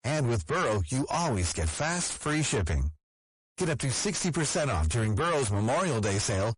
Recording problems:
distortion; heavy; 6 dB below the speech
garbled, watery; slightly; nothing above 10.5 kHz

